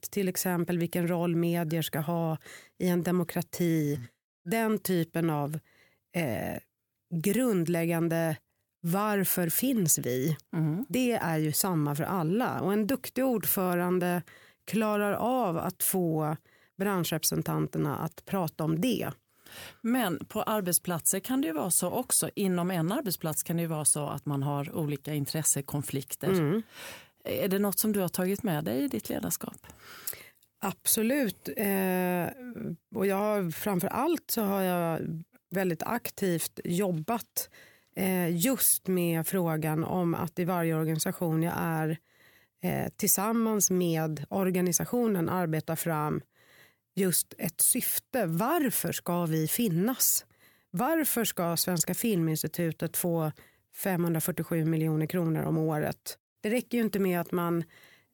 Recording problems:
none

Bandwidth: 18 kHz